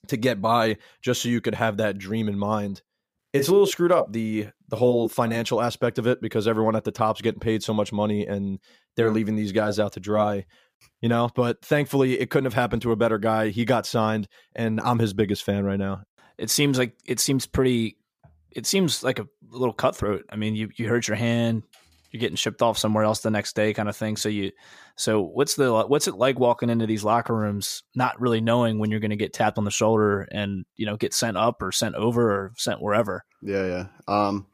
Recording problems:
none

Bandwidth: 15 kHz